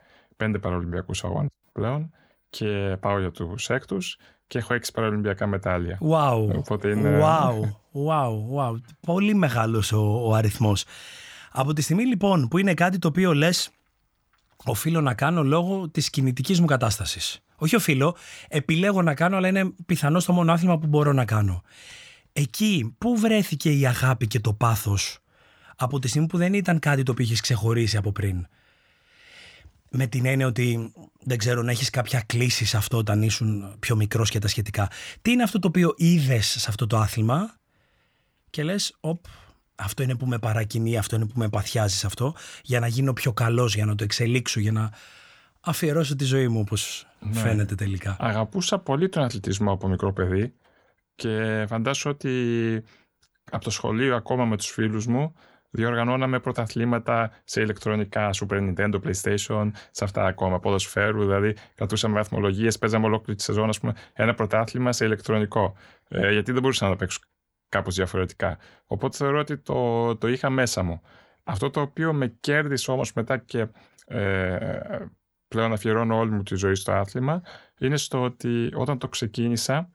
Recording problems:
none

